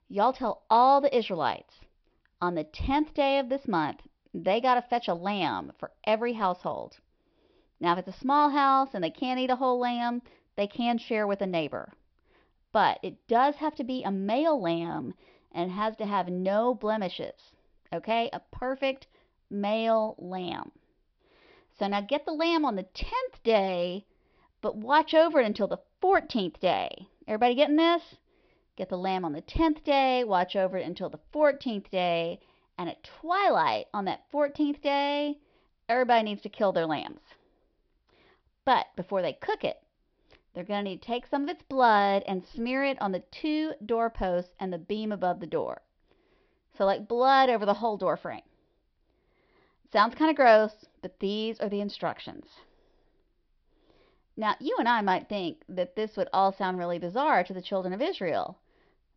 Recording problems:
high frequencies cut off; noticeable; nothing above 5.5 kHz

